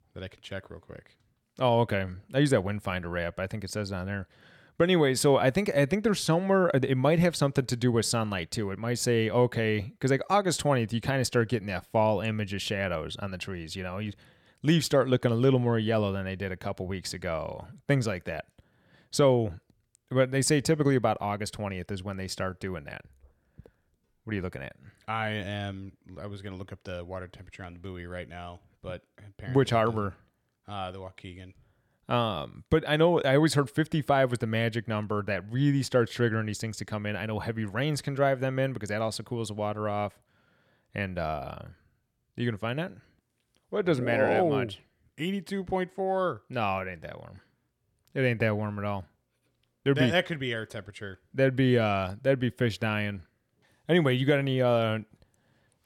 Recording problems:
none

